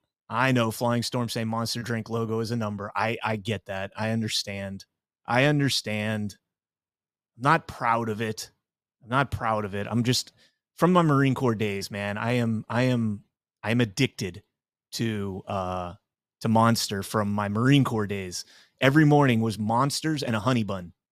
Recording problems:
none

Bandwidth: 14.5 kHz